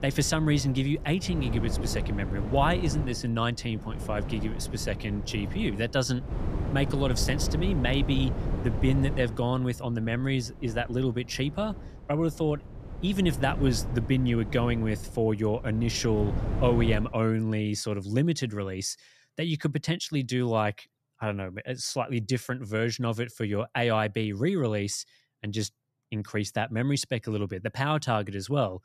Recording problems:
wind noise on the microphone; occasional gusts; until 17 s; 10 dB below the speech

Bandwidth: 14.5 kHz